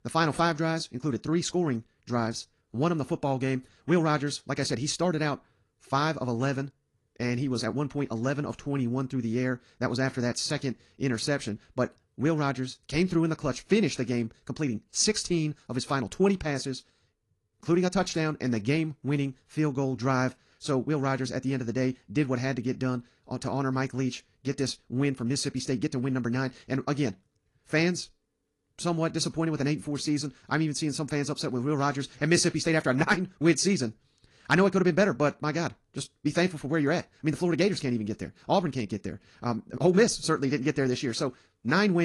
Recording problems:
wrong speed, natural pitch; too fast; 1.5 times normal speed
garbled, watery; slightly
abrupt cut into speech; at the end

